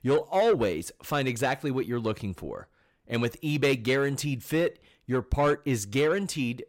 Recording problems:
distortion; slight; 10 dB below the speech

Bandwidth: 16 kHz